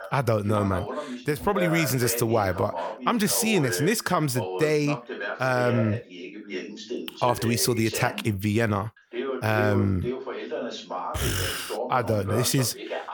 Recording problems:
voice in the background; loud; throughout; 8 dB below the speech

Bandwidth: 18.5 kHz